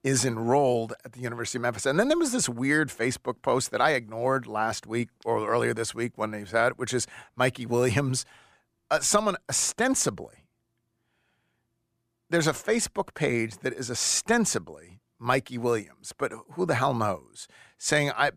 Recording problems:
none

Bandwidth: 15 kHz